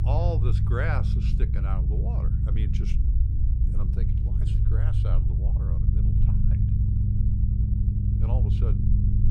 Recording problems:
low rumble; loud; throughout; 2 dB below the speech

